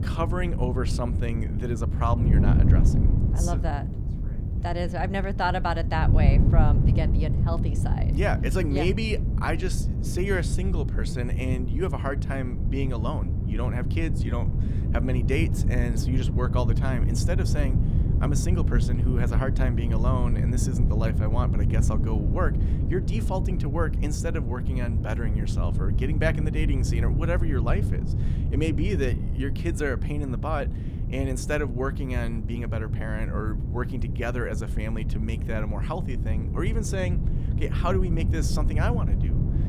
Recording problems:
wind noise on the microphone; heavy; 6 dB below the speech

